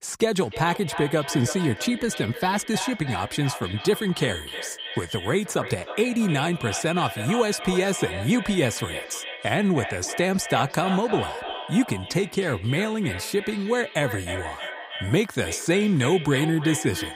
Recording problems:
echo of what is said; strong; throughout; 310 ms later, 9 dB below the speech

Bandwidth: 15.5 kHz